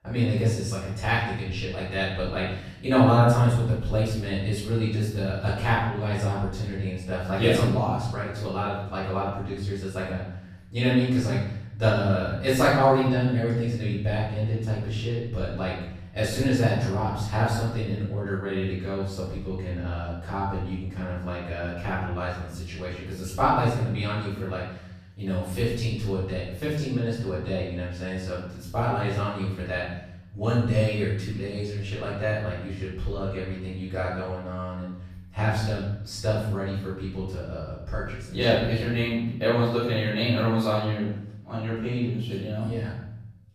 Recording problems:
off-mic speech; far
room echo; noticeable; dies away in 0.8 s

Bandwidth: 14.5 kHz